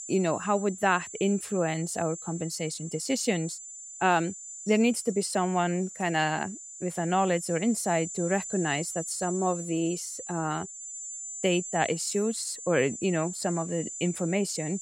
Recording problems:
high-pitched whine; loud; throughout; 7 kHz, 9 dB below the speech

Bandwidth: 16 kHz